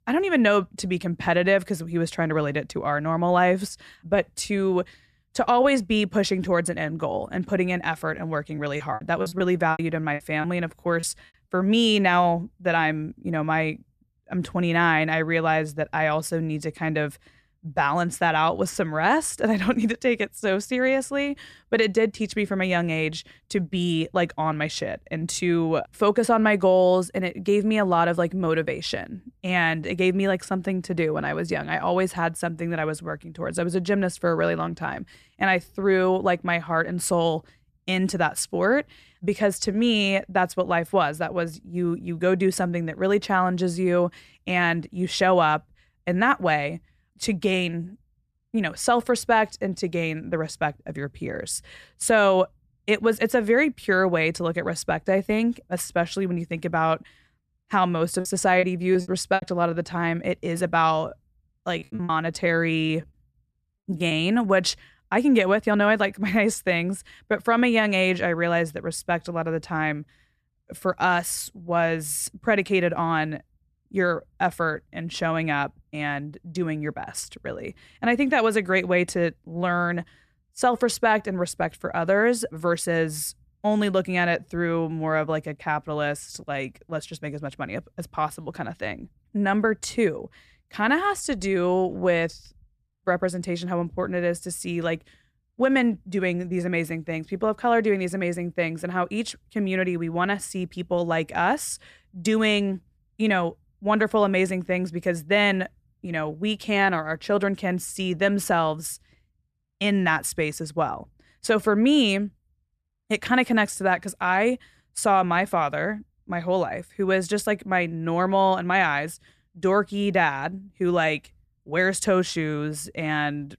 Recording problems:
choppy; very; from 8.5 to 11 s, from 58 to 59 s and from 1:02 to 1:04; 18% of the speech affected

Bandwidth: 14 kHz